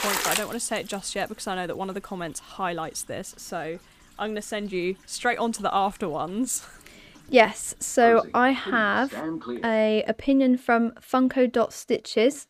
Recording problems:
household noises; loud; until 10 s; 8 dB below the speech

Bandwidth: 15 kHz